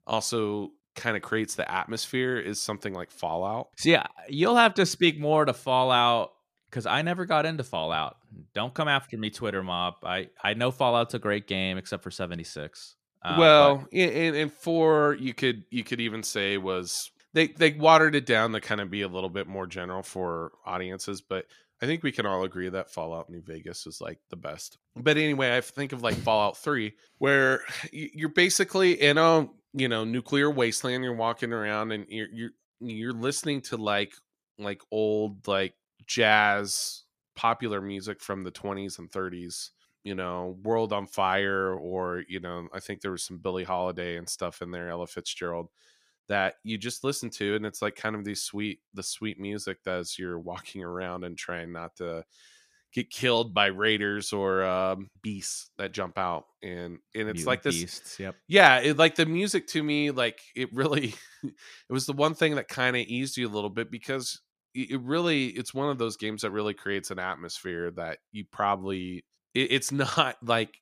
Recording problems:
none

